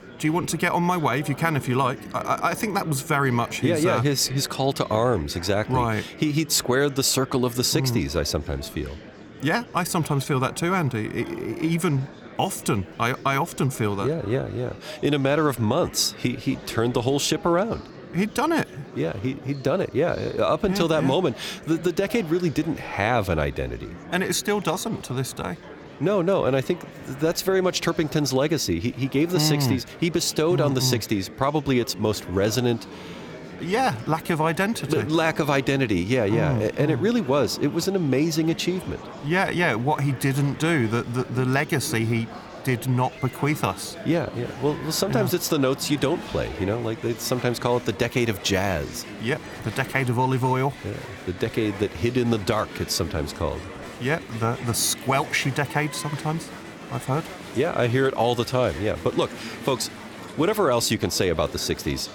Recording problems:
murmuring crowd; noticeable; throughout; 15 dB below the speech

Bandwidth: 18.5 kHz